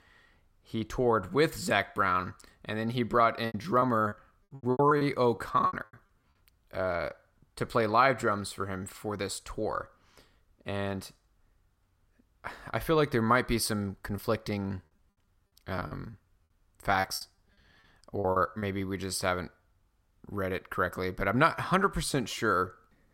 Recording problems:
choppy; very; from 3.5 to 6 s and from 14 to 19 s; 20% of the speech affected

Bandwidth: 16 kHz